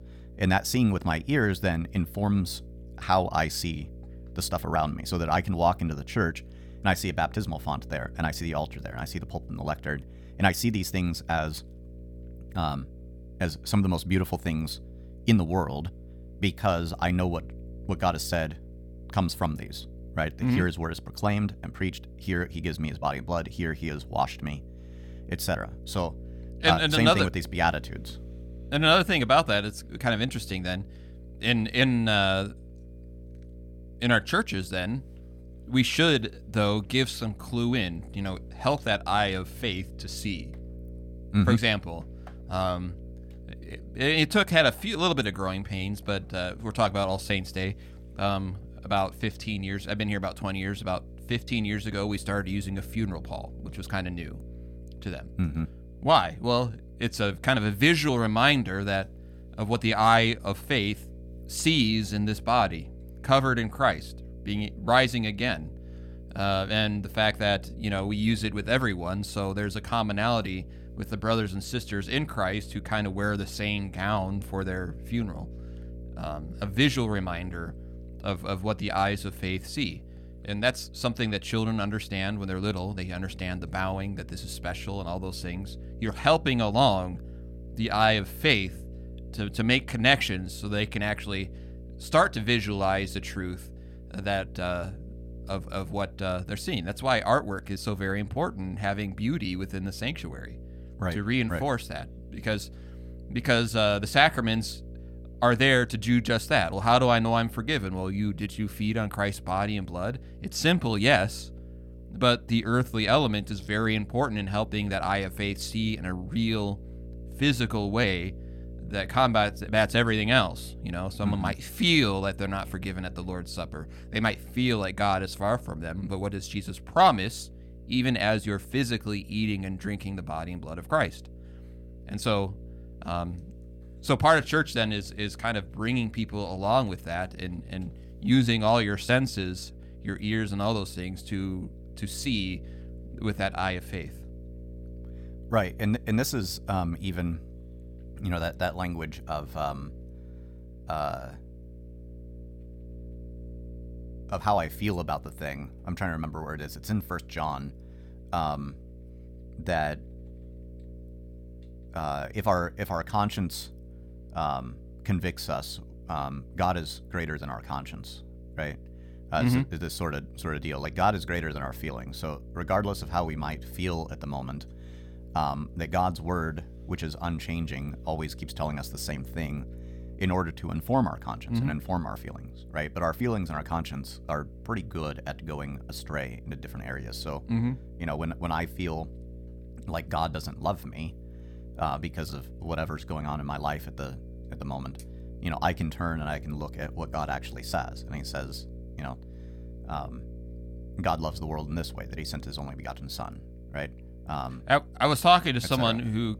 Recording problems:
electrical hum; faint; throughout; 60 Hz, 25 dB below the speech

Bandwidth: 17.5 kHz